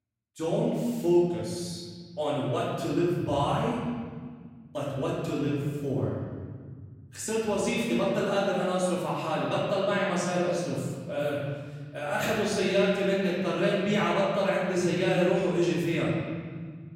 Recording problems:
room echo; strong; dies away in 1.9 s
off-mic speech; far

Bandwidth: 16 kHz